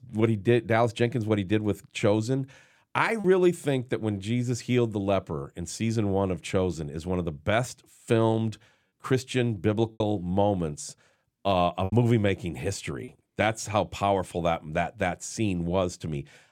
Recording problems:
choppy; occasionally; at 3 s, at 10 s and from 12 to 13 s; 4% of the speech affected

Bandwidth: 17.5 kHz